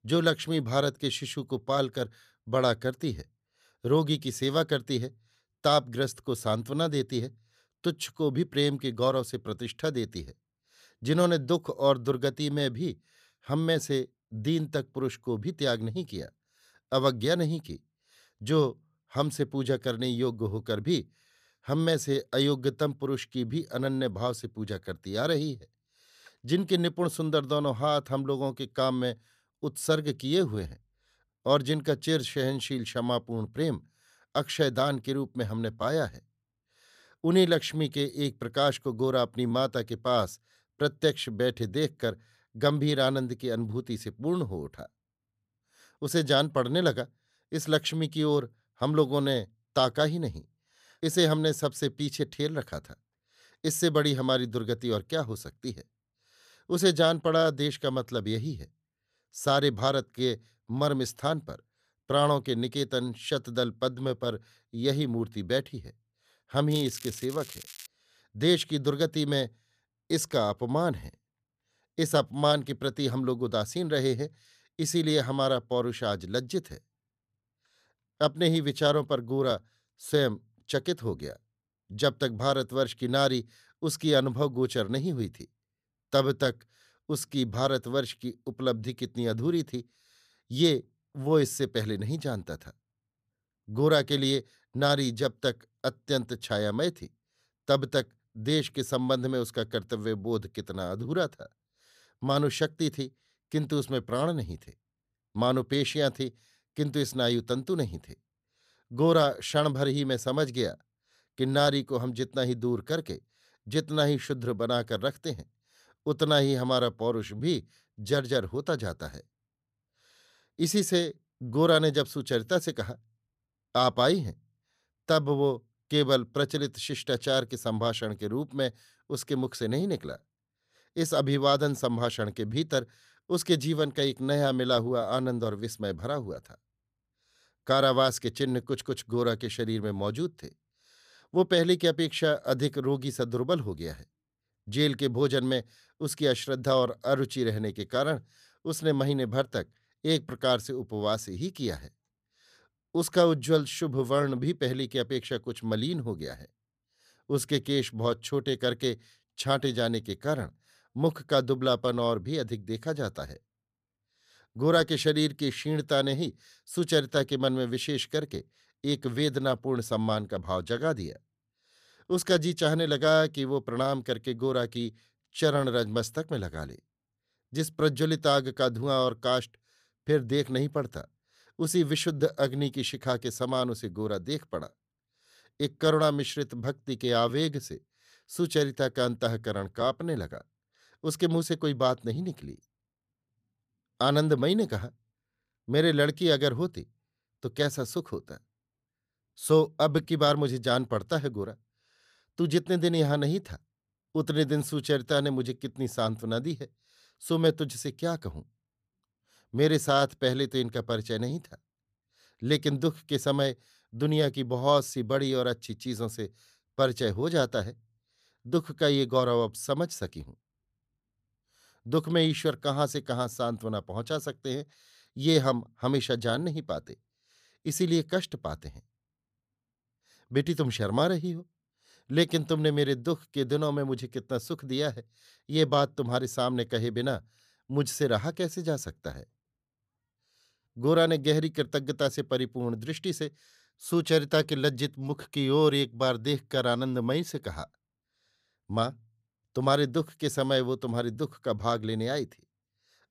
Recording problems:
crackling; noticeable; from 1:07 to 1:08; 15 dB below the speech

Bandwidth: 14.5 kHz